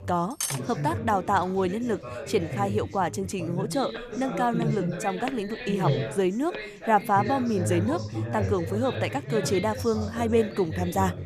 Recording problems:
background chatter; loud; throughout; 3 voices, 5 dB below the speech
clattering dishes; noticeable; at 0.5 s; peak 2 dB below the speech
footsteps; faint; from 4 to 6.5 s; peak 10 dB below the speech

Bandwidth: 14.5 kHz